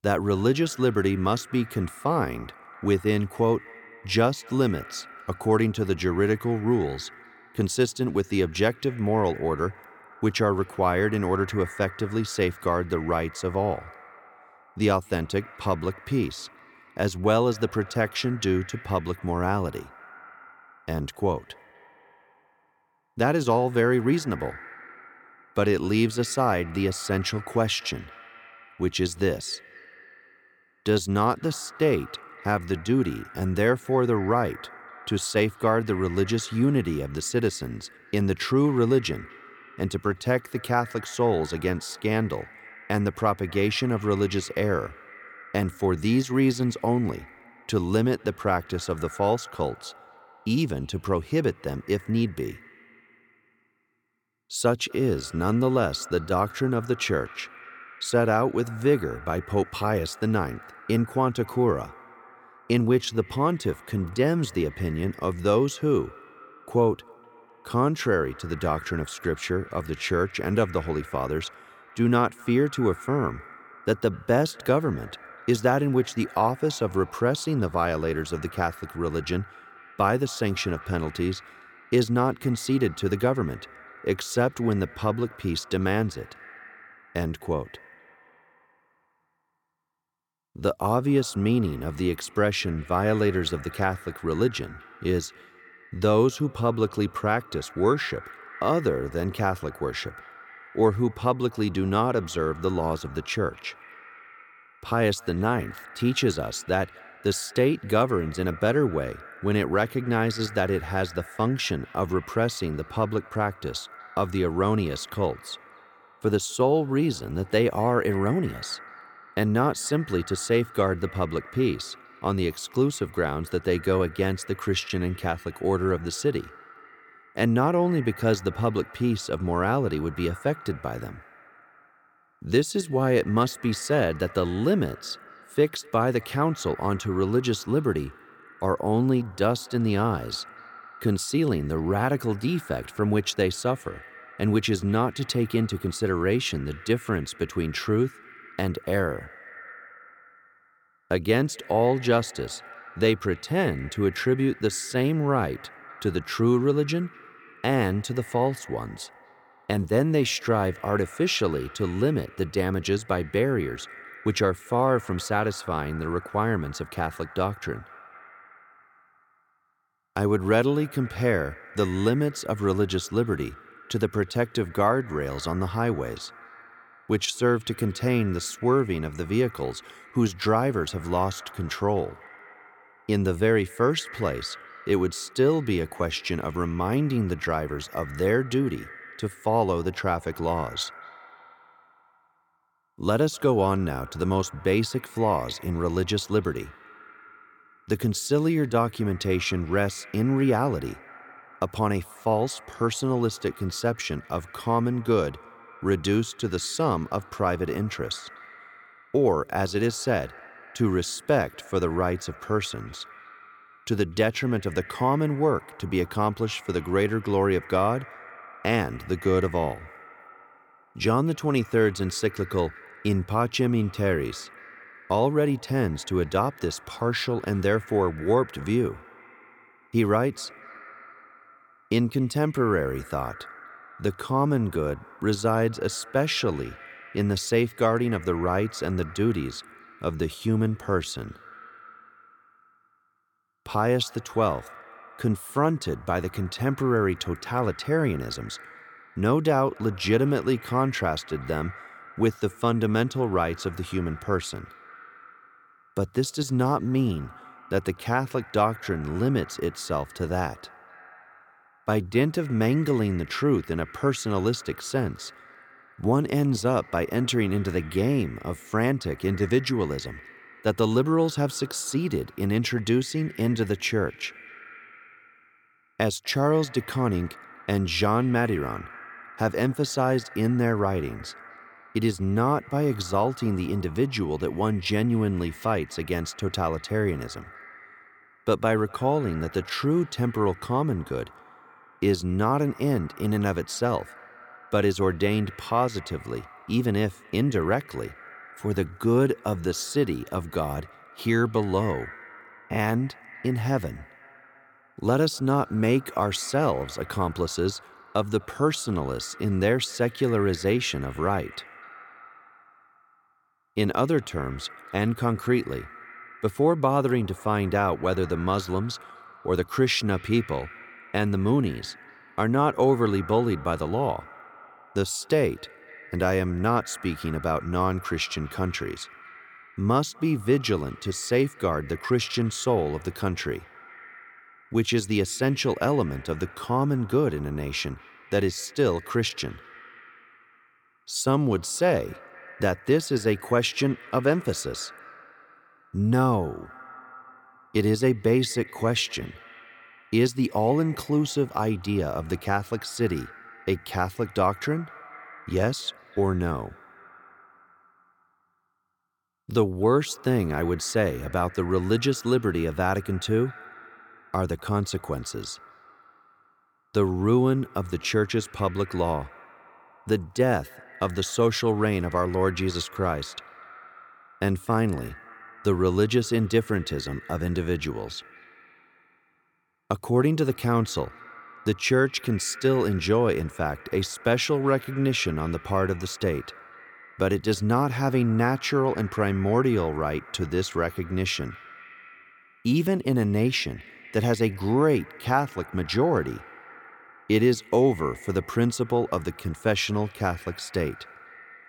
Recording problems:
echo of what is said; faint; throughout; 250 ms later, 20 dB below the speech

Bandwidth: 17.5 kHz